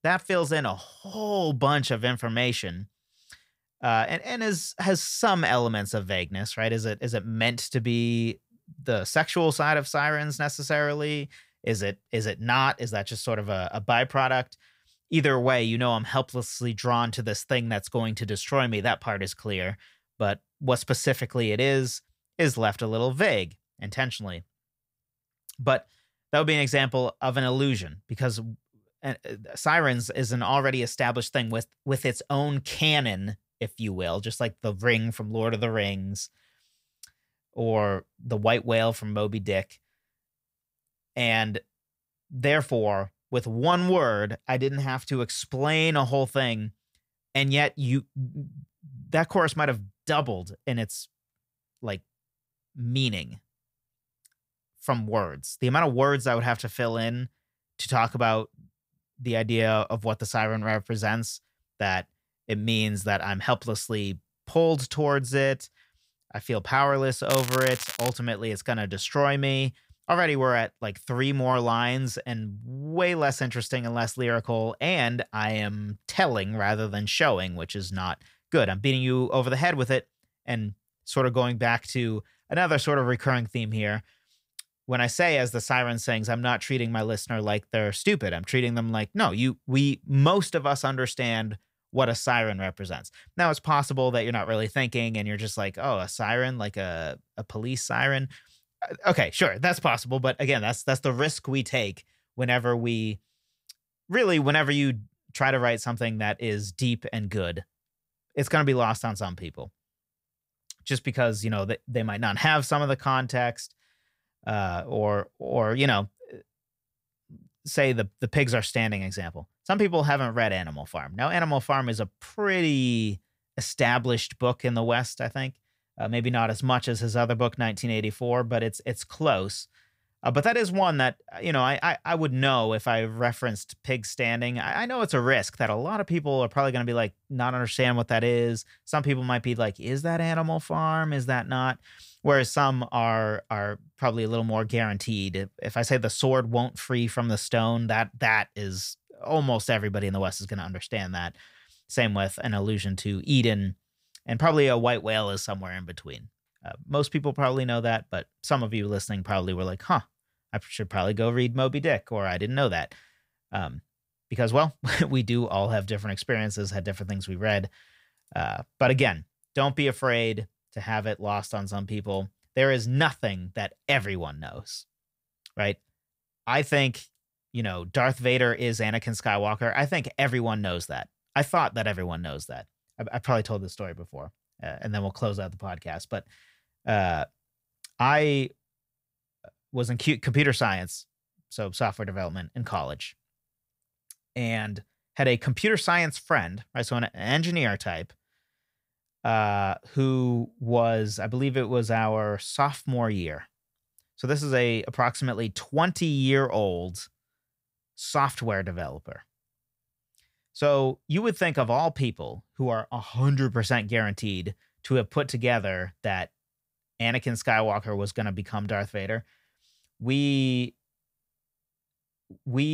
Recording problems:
crackling; loud; at 1:07; 6 dB below the speech
abrupt cut into speech; at the end

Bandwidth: 15.5 kHz